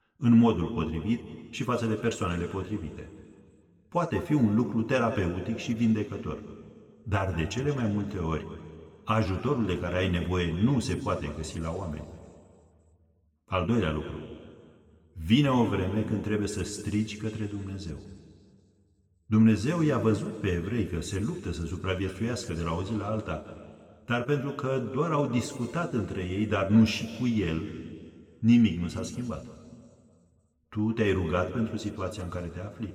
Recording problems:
room echo; noticeable; dies away in 2 s
off-mic speech; somewhat distant

